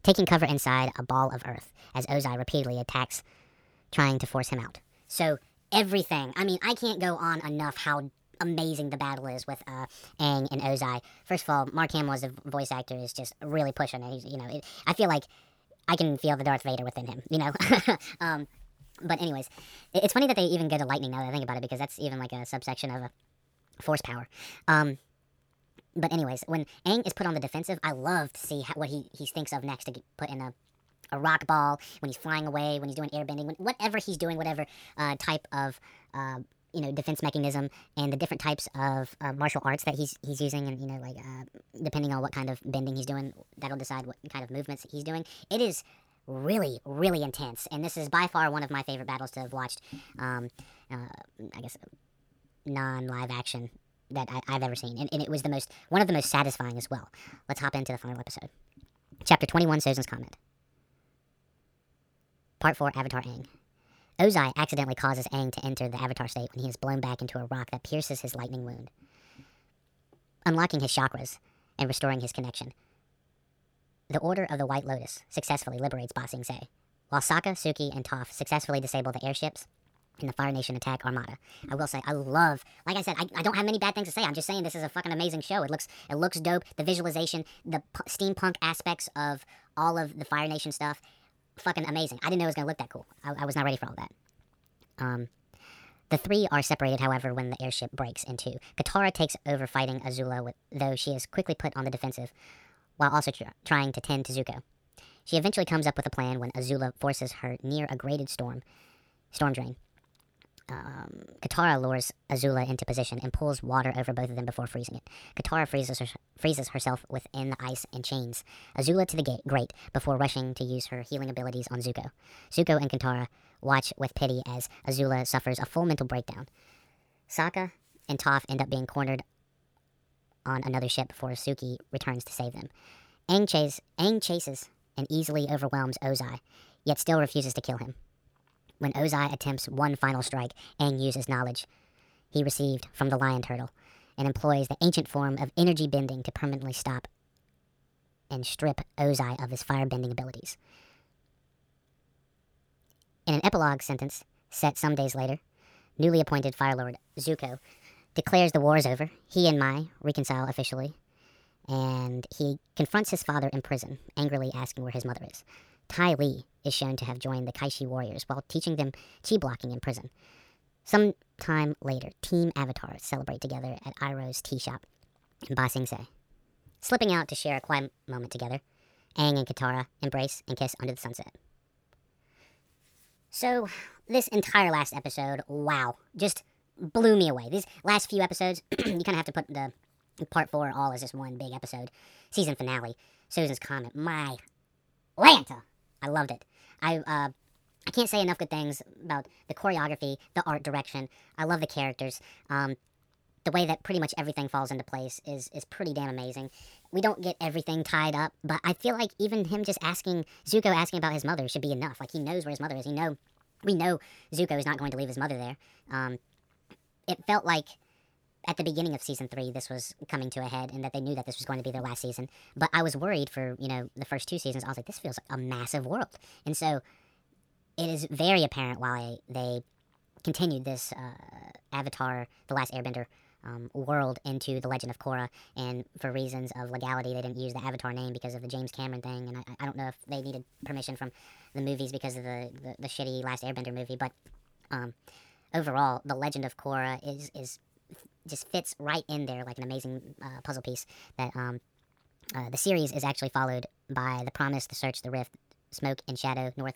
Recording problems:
wrong speed and pitch; too fast and too high; 1.5 times normal speed

